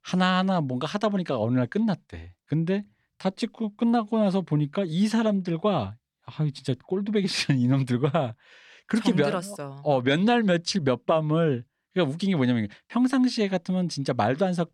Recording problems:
none

